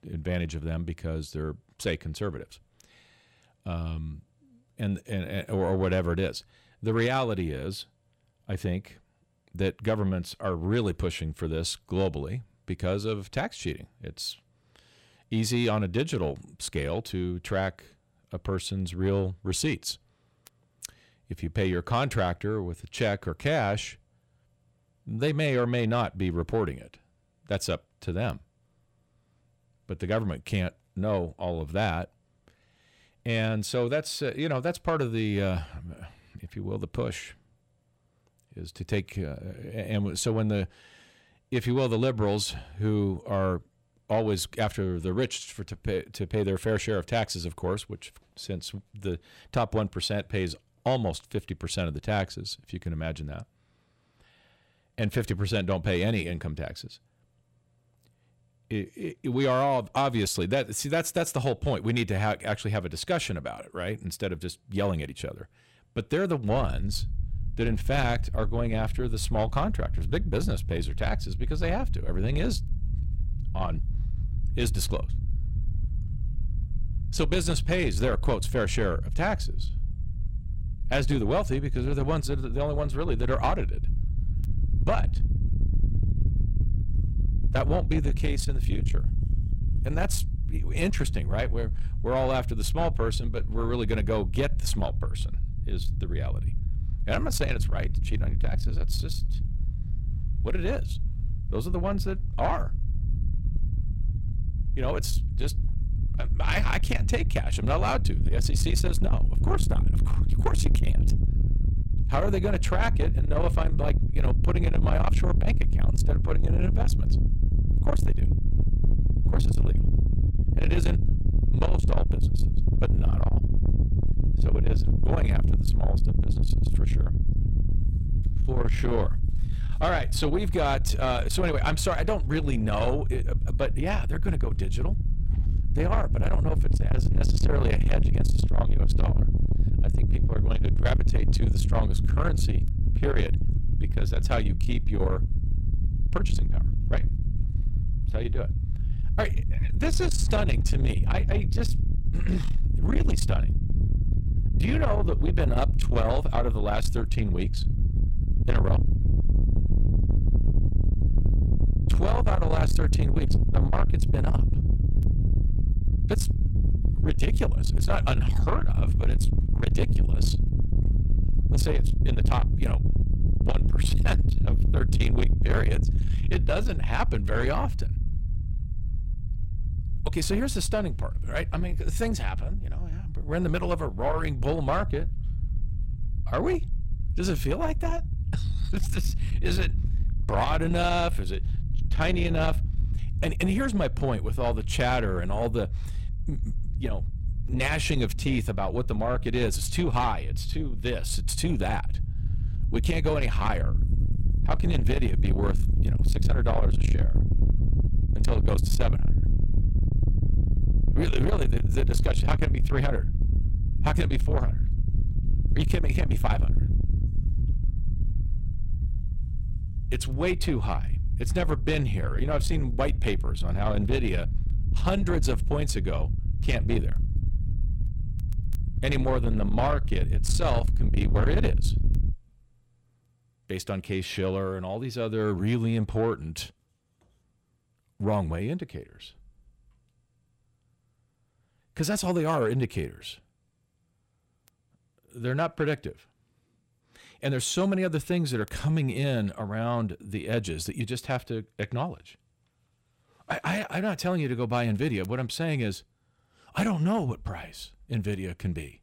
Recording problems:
distortion; heavy; 7 dB below the speech
low rumble; loud; from 1:06 to 3:52; 10 dB below the speech

